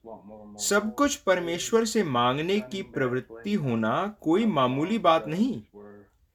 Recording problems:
voice in the background; faint; throughout; 20 dB below the speech

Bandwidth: 18.5 kHz